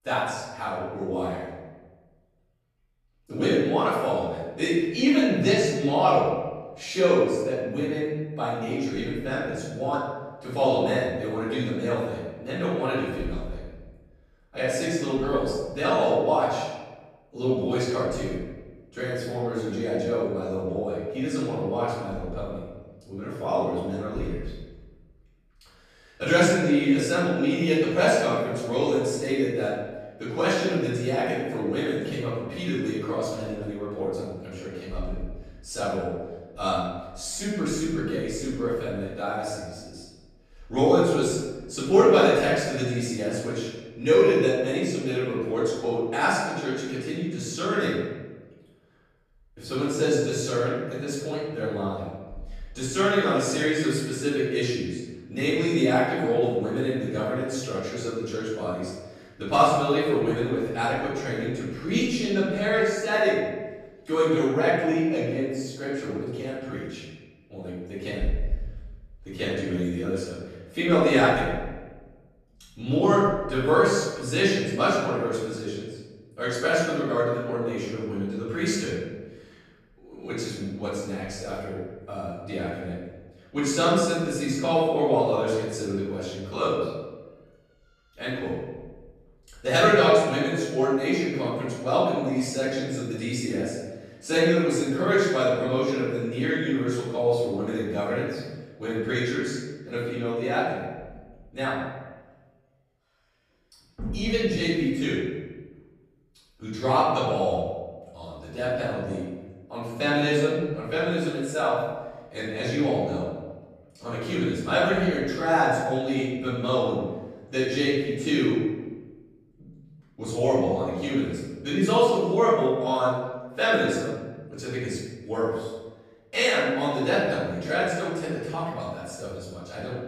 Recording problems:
room echo; strong; dies away in 1.2 s
off-mic speech; far

